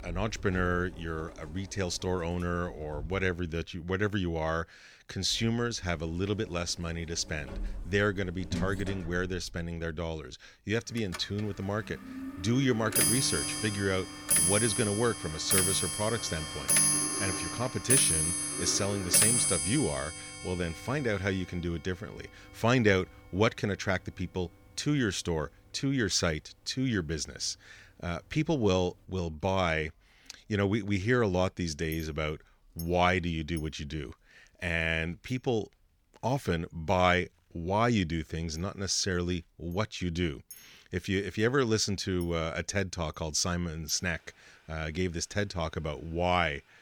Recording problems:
household noises; very loud; throughout; 2 dB above the speech

